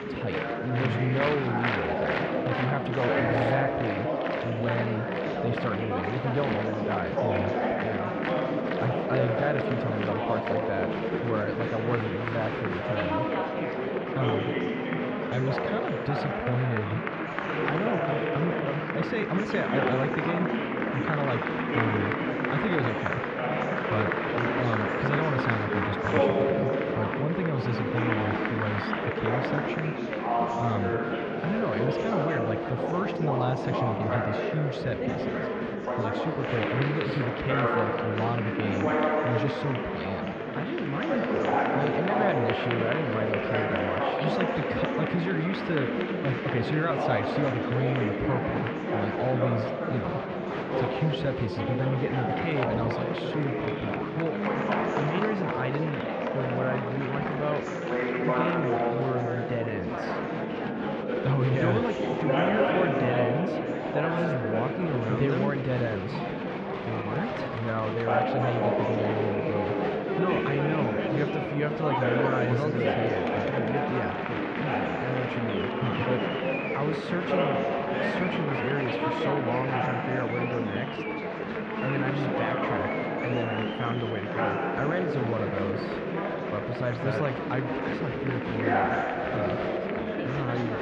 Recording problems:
muffled; very; fading above 3 kHz
chatter from many people; very loud; throughout; 3 dB above the speech

